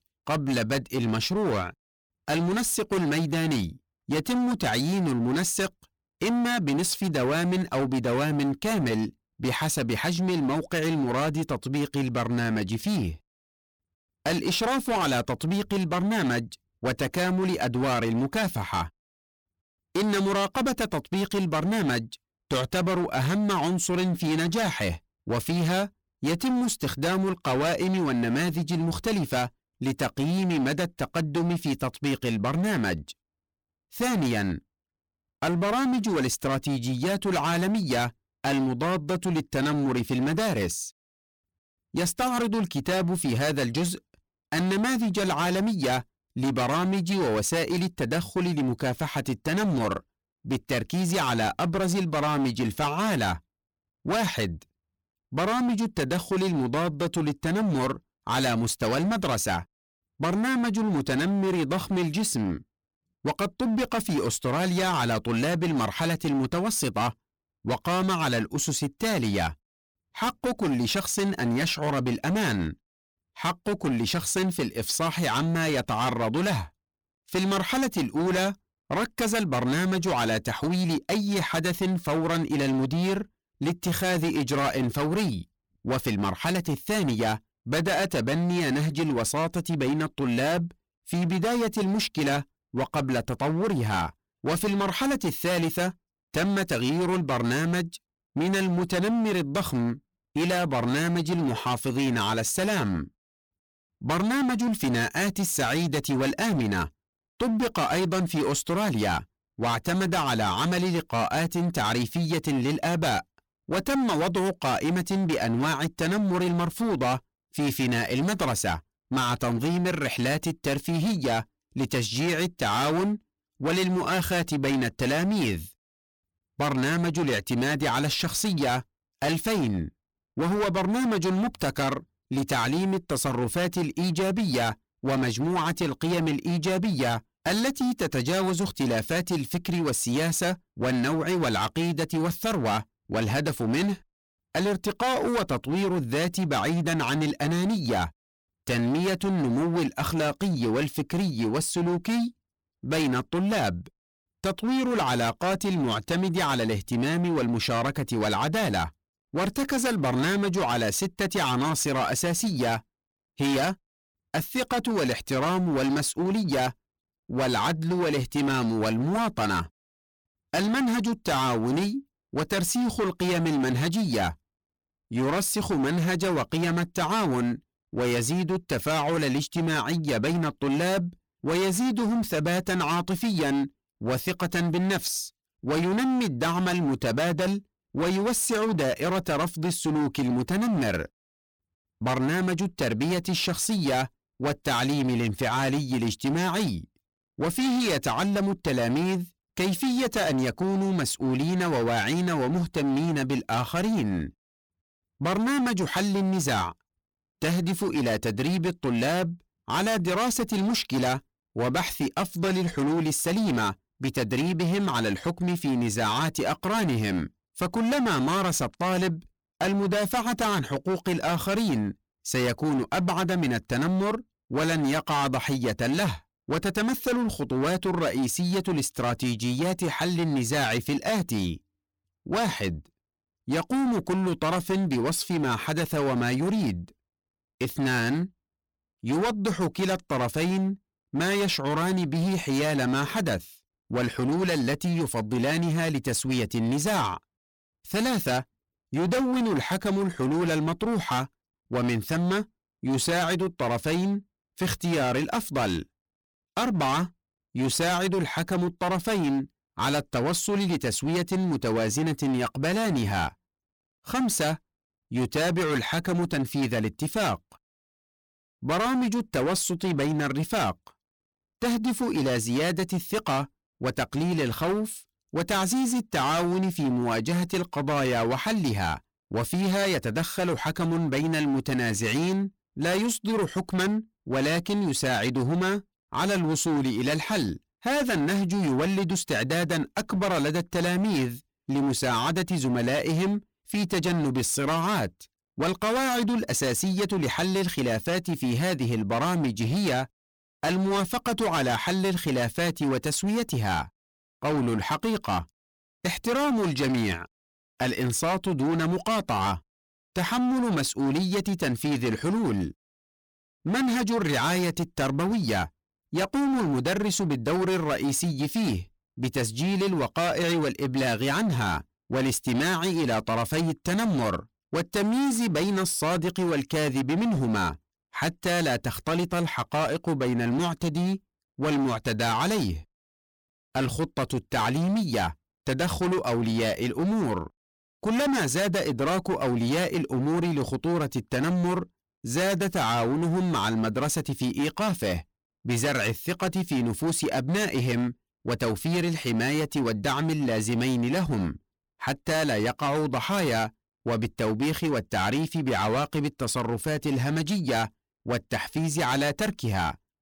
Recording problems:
distortion; heavy; 25% of the sound clipped

